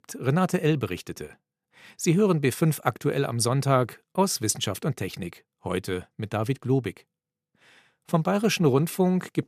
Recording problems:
none

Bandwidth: 14.5 kHz